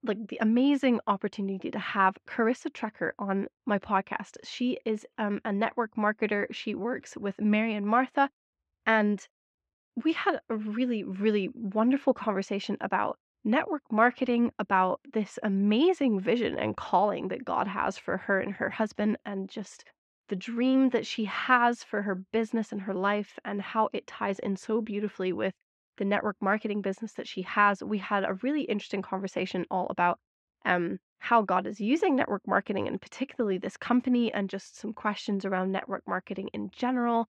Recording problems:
muffled; slightly; fading above 2.5 kHz

